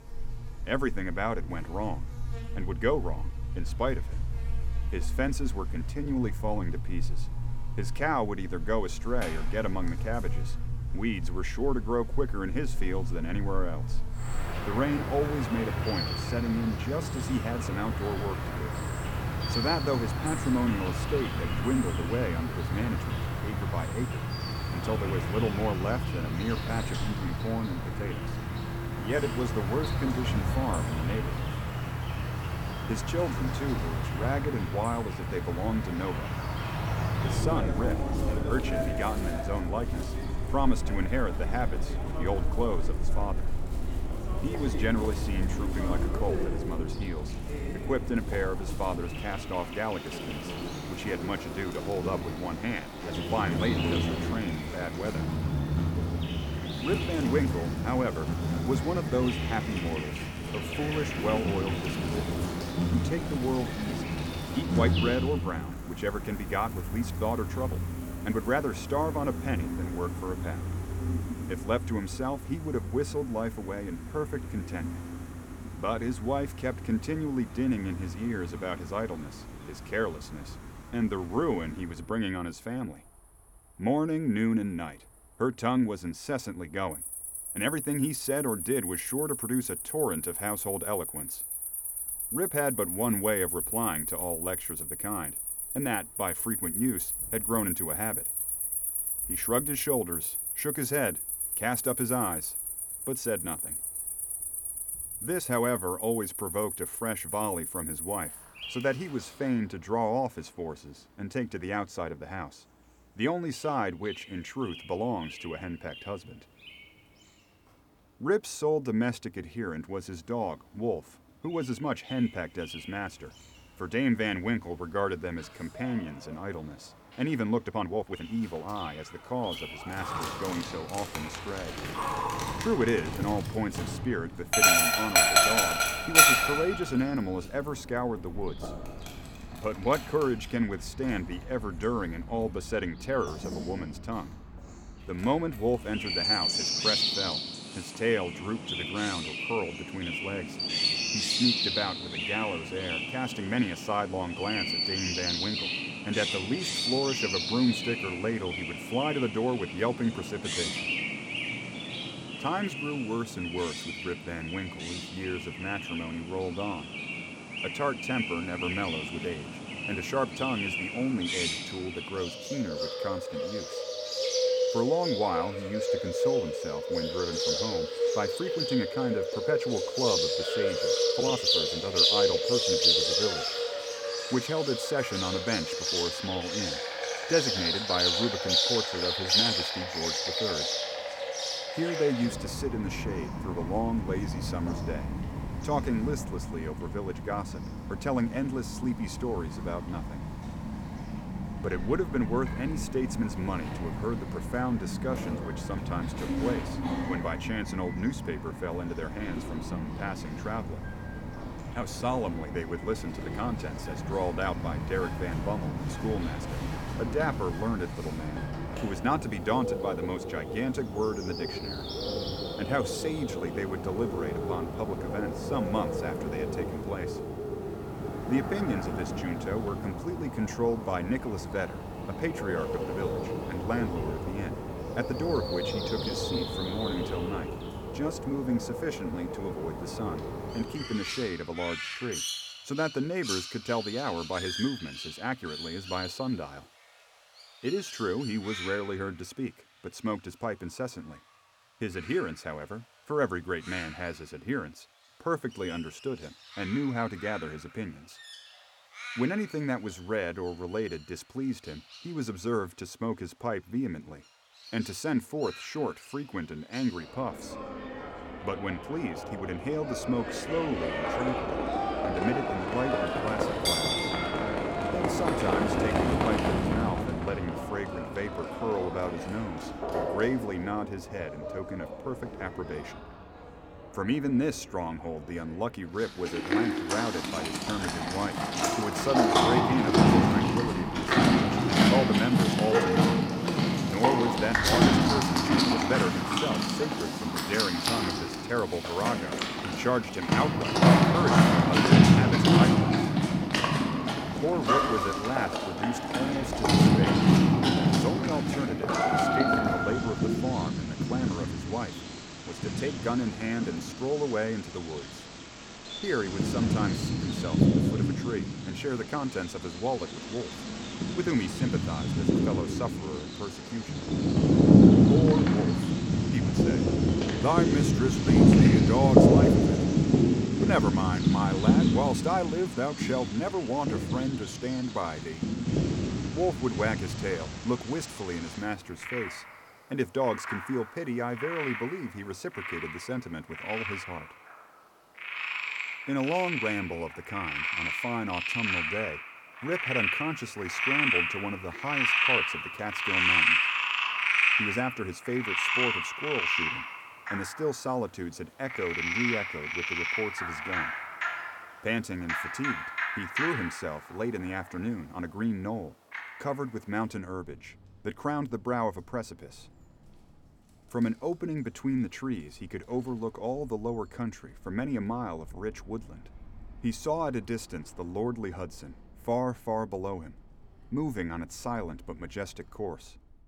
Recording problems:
animal sounds; very loud; throughout; 4 dB above the speech
uneven, jittery; strongly; from 6 s to 4:56

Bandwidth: 18.5 kHz